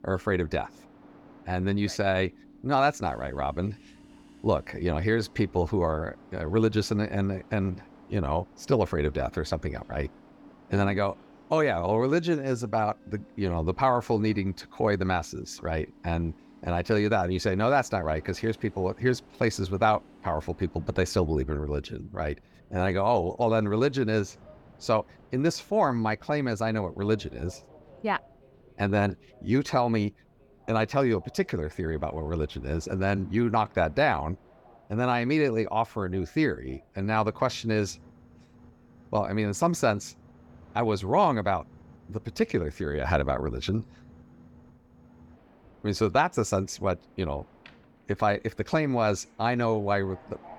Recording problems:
train or aircraft noise; faint; throughout; 25 dB below the speech

